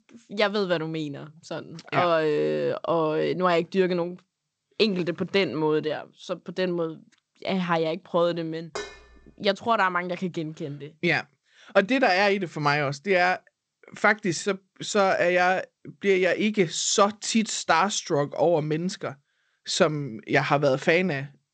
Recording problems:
garbled, watery; slightly; nothing above 8 kHz
clattering dishes; faint; at 9 s; peak 10 dB below the speech

